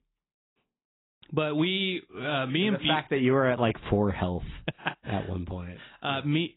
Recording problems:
garbled, watery; badly; nothing above 3.5 kHz

